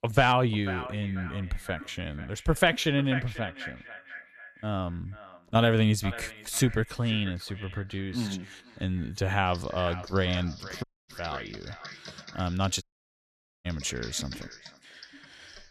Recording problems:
echo of what is said; noticeable; throughout; 490 ms later, 15 dB below the speech
keyboard typing; faint; from 9.5 s on; peak 15 dB below the speech
audio cutting out; at 11 s and at 13 s for 1 s

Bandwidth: 14 kHz